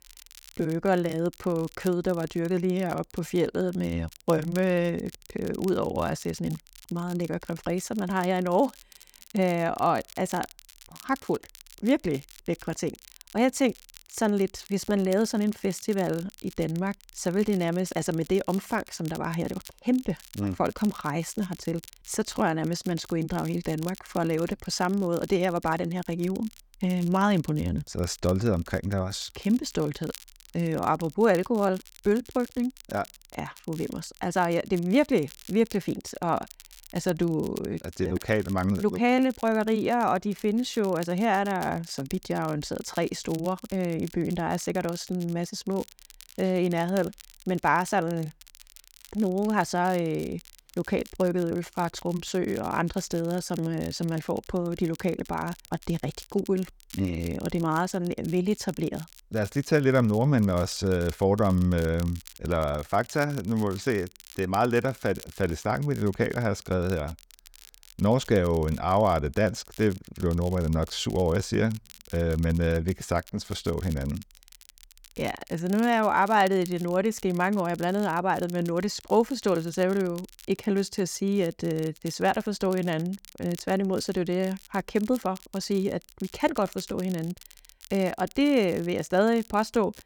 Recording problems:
crackle, like an old record; faint; 20 dB below the speech

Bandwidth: 19 kHz